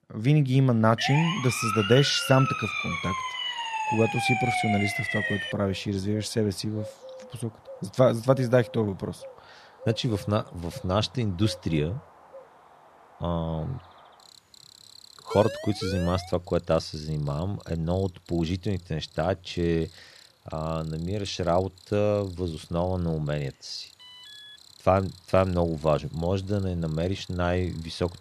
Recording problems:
animal sounds; faint; throughout; 20 dB below the speech
siren; loud; from 1 to 5.5 s; peak 2 dB above the speech
siren; noticeable; from 15 to 16 s; peak 8 dB below the speech
alarm; faint; at 24 s; peak 15 dB below the speech

